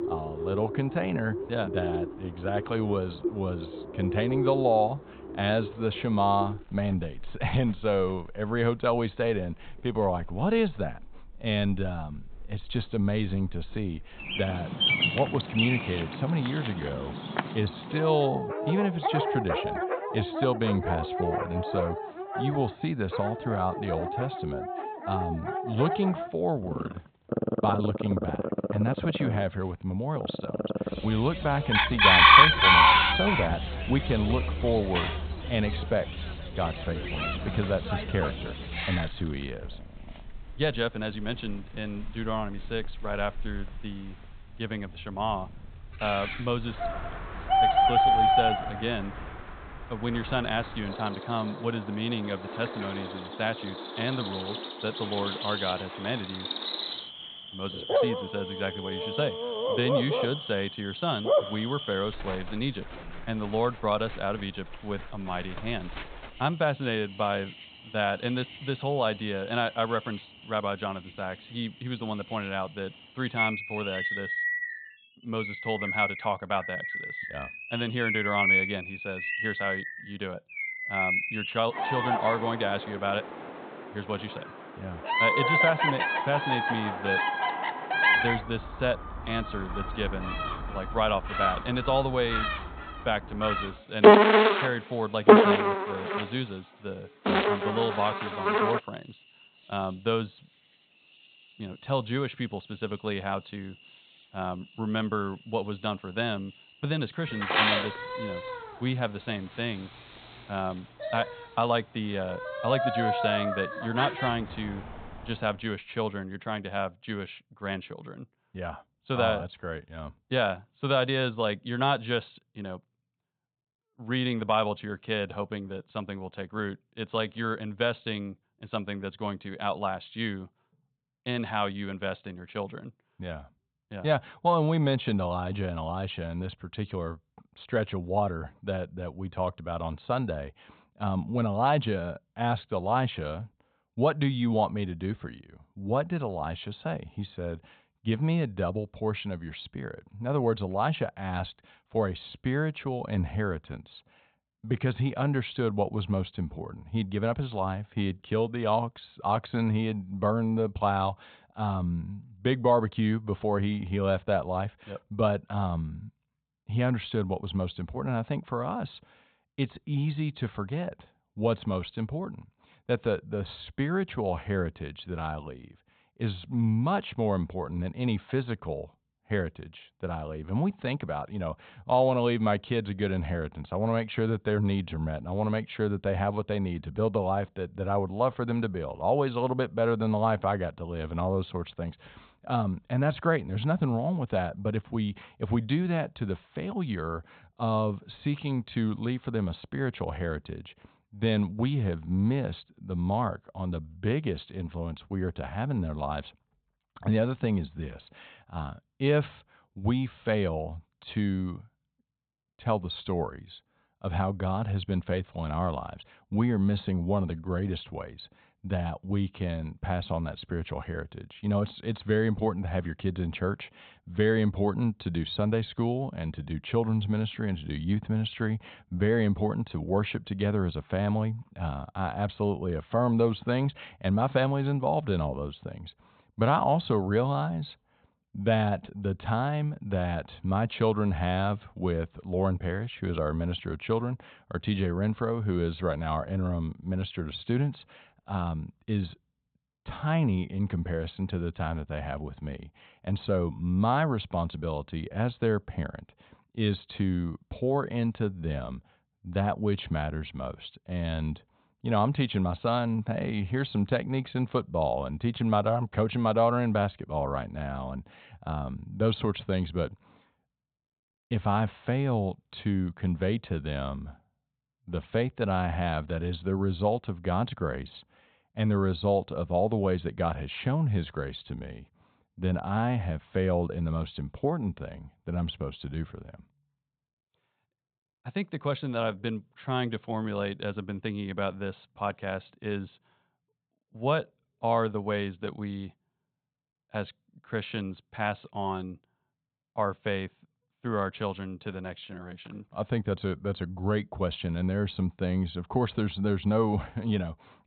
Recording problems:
high frequencies cut off; severe; nothing above 4 kHz
animal sounds; very loud; until 1:55; 3 dB above the speech

